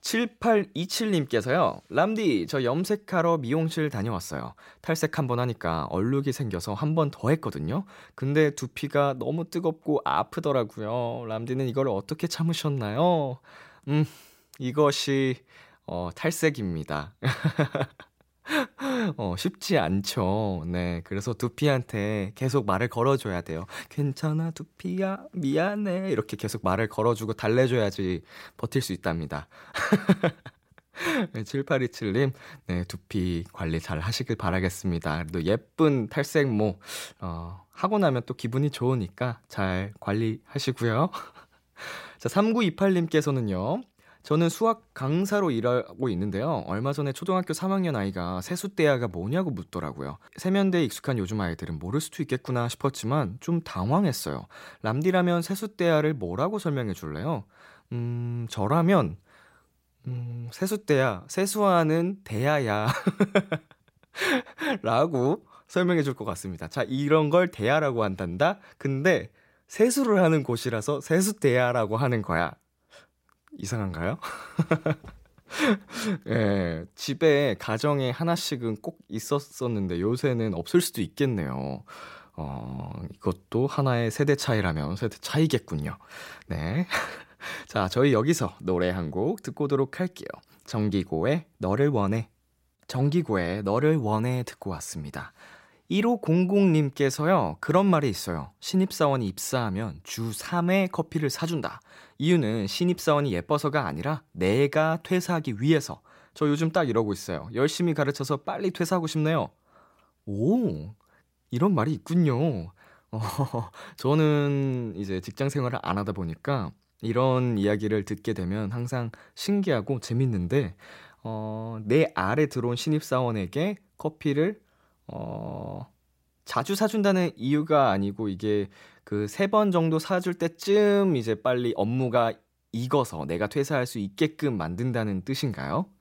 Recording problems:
none

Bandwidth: 16 kHz